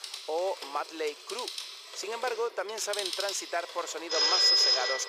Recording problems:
thin; very; fading below 400 Hz
alarms or sirens; very loud; throughout; 9 dB above the speech
household noises; noticeable; throughout; 15 dB below the speech

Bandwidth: 15.5 kHz